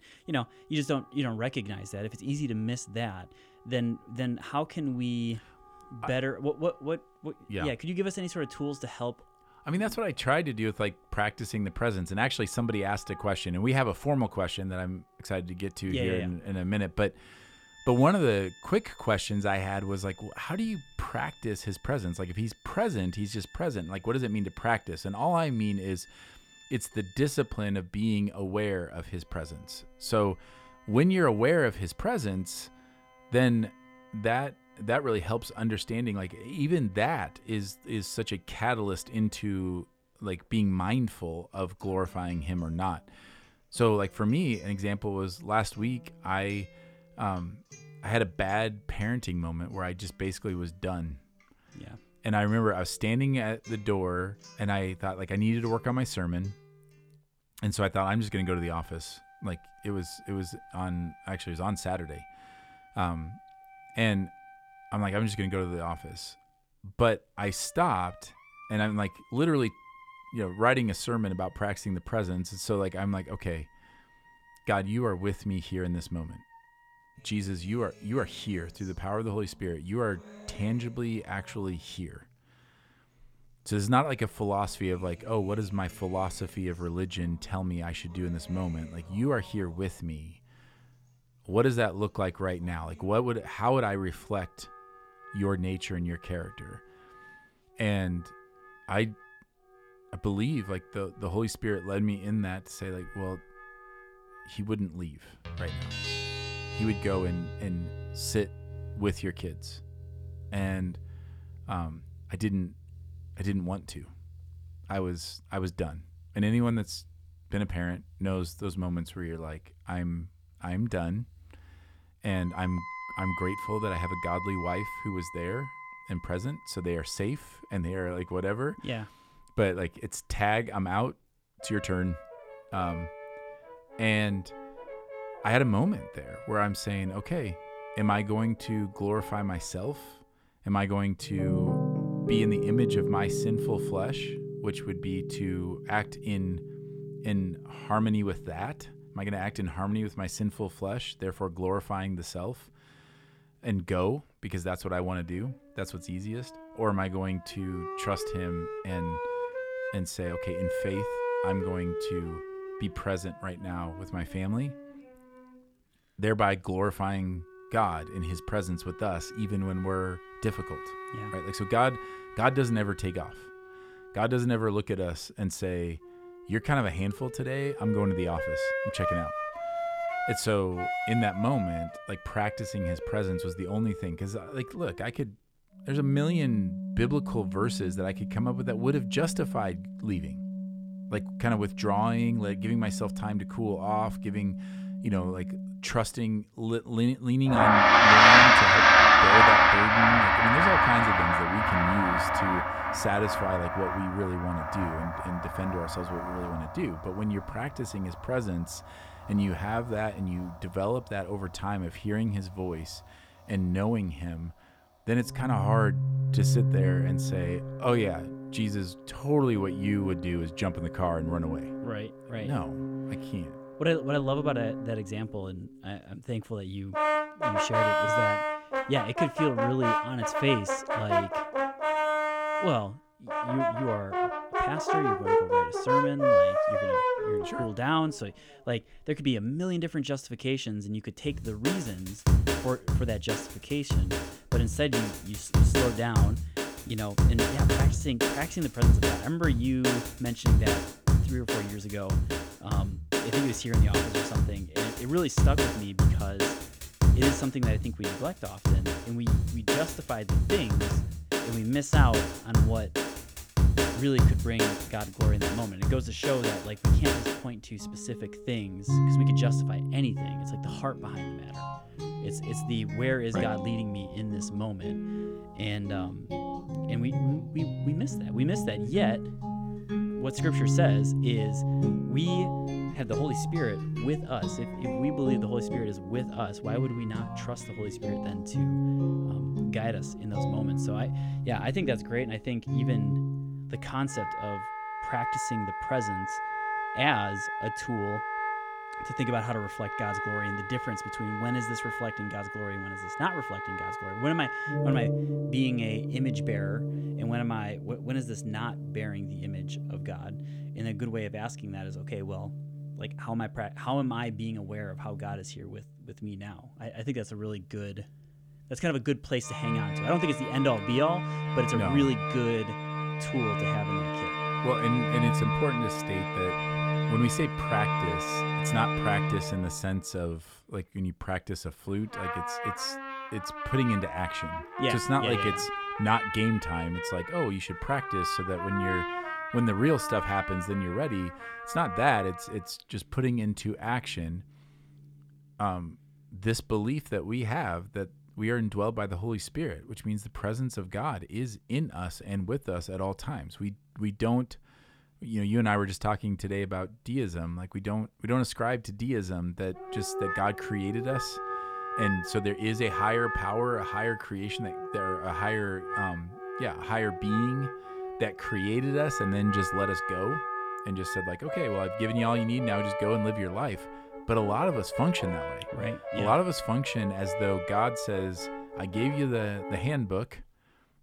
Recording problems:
background music; very loud; throughout; 2 dB above the speech

